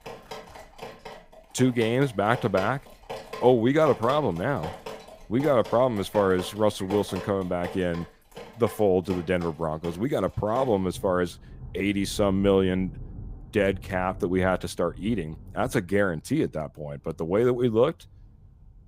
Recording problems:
rain or running water; noticeable; throughout; 15 dB below the speech

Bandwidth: 15.5 kHz